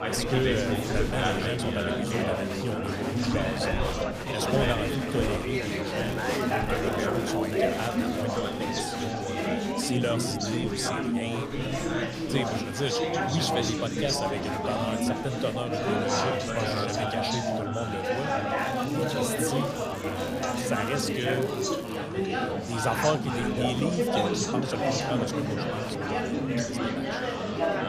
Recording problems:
chatter from many people; very loud; throughout; 4 dB above the speech
crackling; noticeable; from 6 to 8 s and from 19 to 22 s; 15 dB below the speech

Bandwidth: 15 kHz